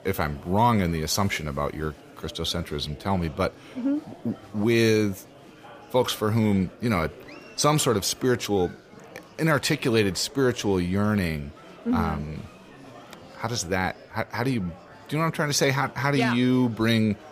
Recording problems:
murmuring crowd; faint; throughout; 20 dB below the speech

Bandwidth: 15 kHz